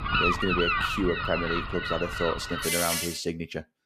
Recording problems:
animal sounds; very loud; until 3 s; 3 dB above the speech

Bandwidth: 14.5 kHz